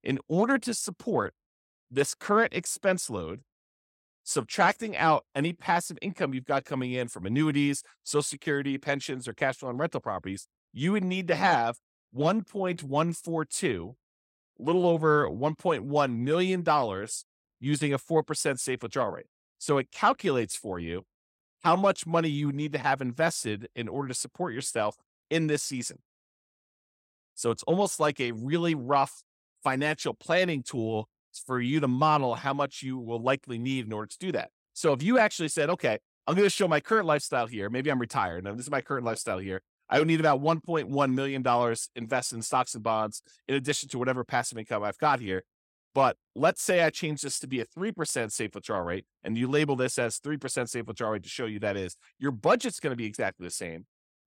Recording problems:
none

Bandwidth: 16 kHz